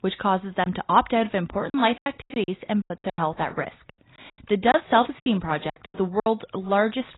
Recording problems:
garbled, watery; badly; nothing above 4 kHz
choppy; very; 12% of the speech affected

